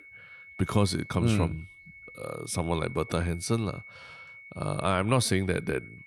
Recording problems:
high-pitched whine; noticeable; throughout; 2 kHz, 20 dB below the speech

